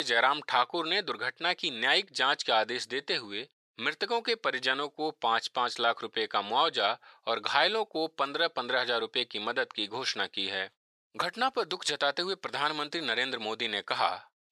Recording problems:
thin; very; fading below 800 Hz
abrupt cut into speech; at the start

